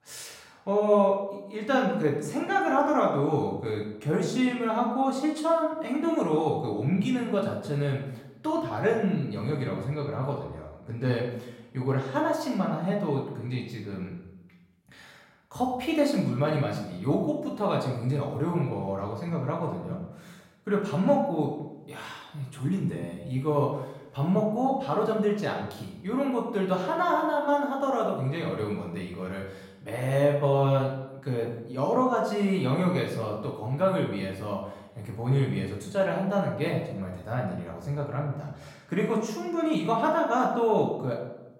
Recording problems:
off-mic speech; far
room echo; noticeable; dies away in 0.7 s

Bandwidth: 16 kHz